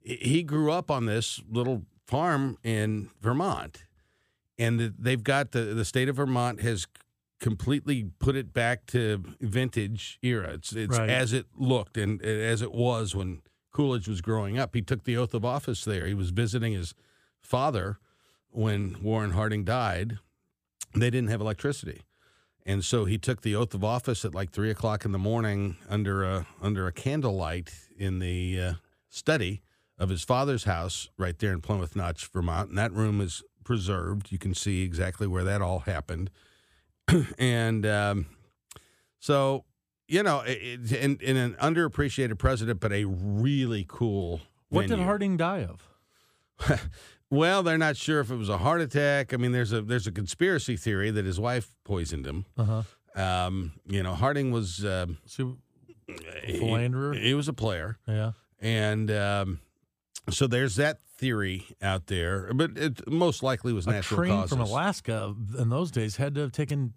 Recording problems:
none

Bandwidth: 15 kHz